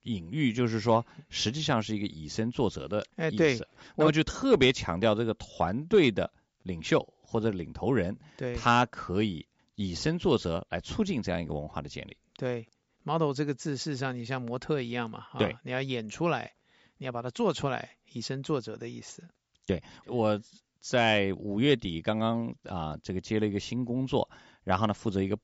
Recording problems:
high frequencies cut off; noticeable; nothing above 7.5 kHz

